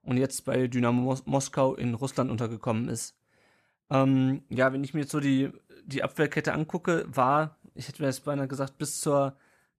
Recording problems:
none

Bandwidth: 14.5 kHz